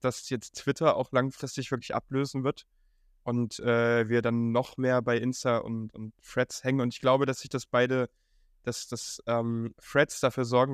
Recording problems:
abrupt cut into speech; at the end

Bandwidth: 14.5 kHz